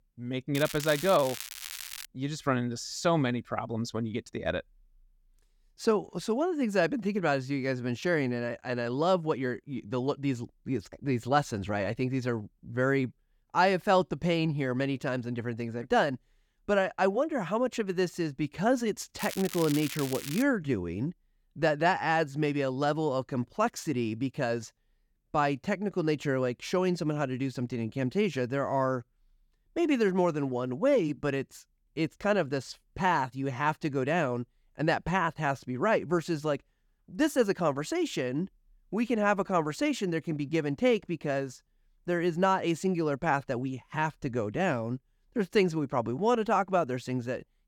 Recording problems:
crackling; loud; from 0.5 to 2 s and from 19 to 20 s; 9 dB below the speech

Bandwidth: 18 kHz